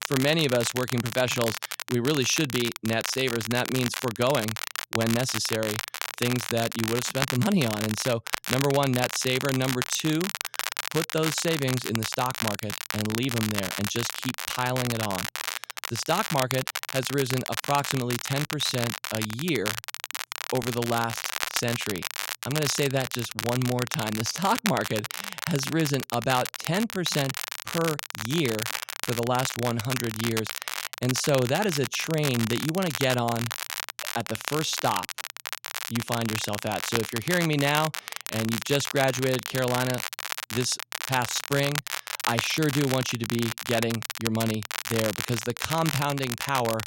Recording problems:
crackle, like an old record; loud; 4 dB below the speech

